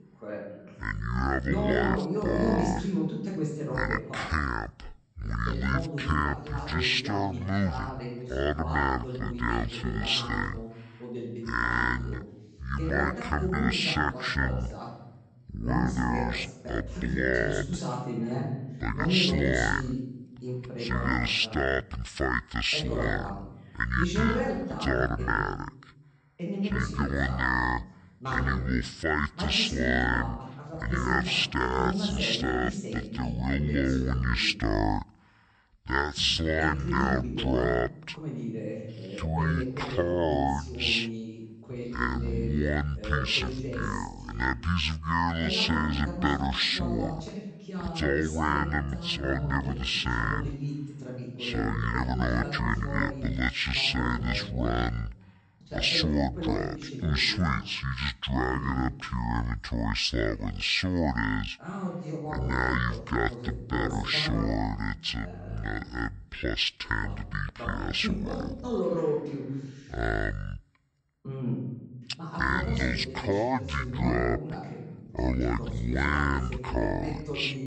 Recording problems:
wrong speed and pitch; too slow and too low; 0.6 times normal speed
voice in the background; loud; throughout; 7 dB below the speech

